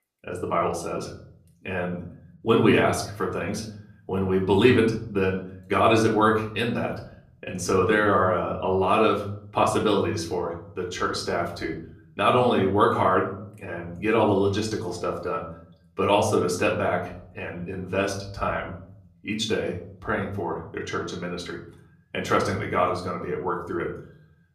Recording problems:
off-mic speech; far
room echo; slight; dies away in 0.6 s

